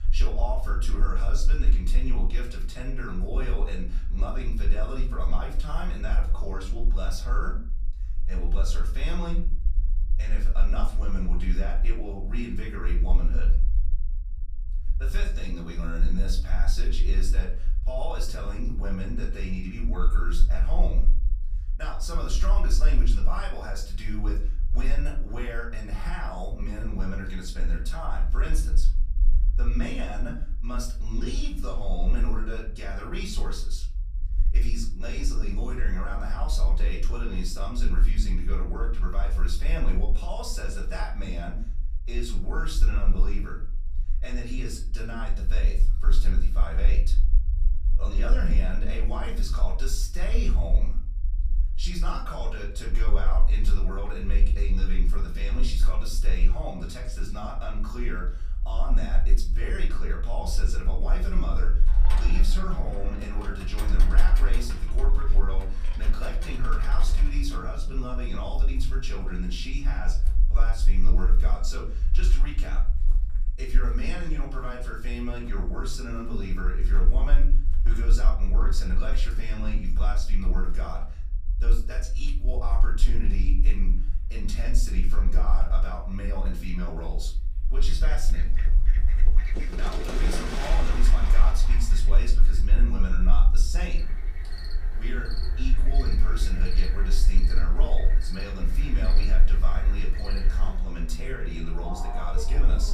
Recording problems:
off-mic speech; far
room echo; slight; dies away in 0.4 s
animal sounds; loud; from 1:02 on; 8 dB below the speech
low rumble; noticeable; throughout; 15 dB below the speech

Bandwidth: 14.5 kHz